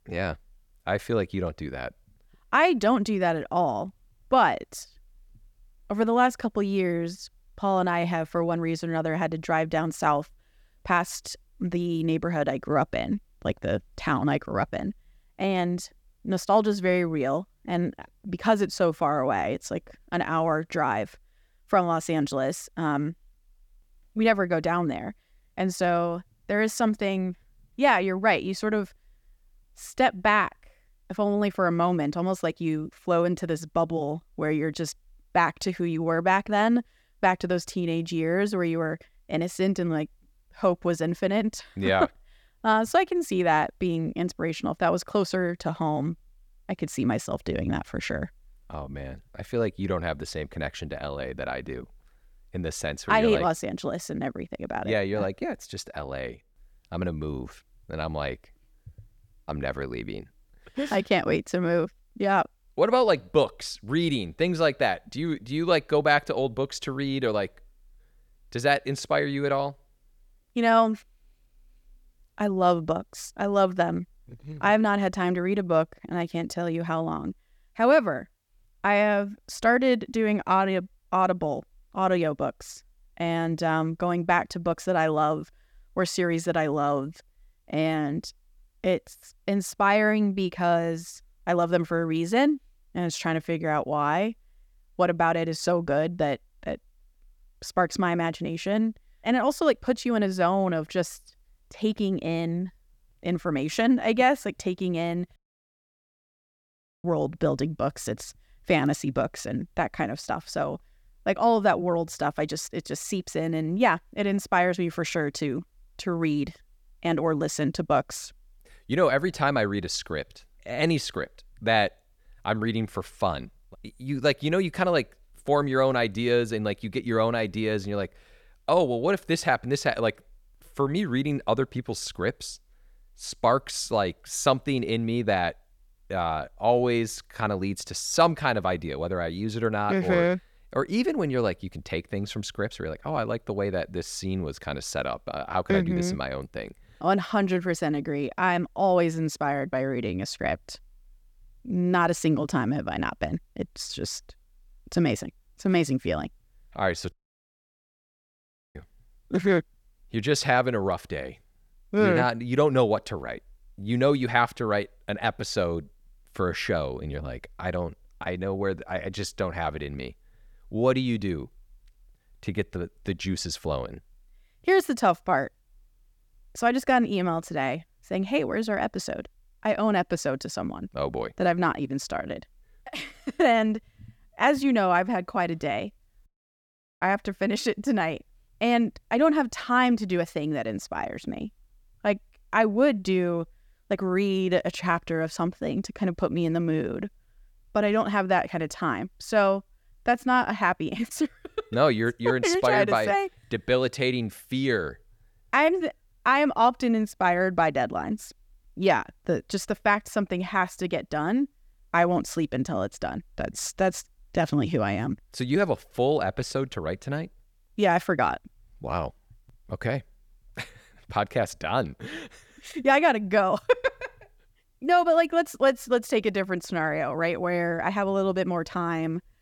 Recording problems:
audio cutting out; at 1:45 for 1.5 s, at 2:37 for 1.5 s and at 3:06 for 1 s

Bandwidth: 18.5 kHz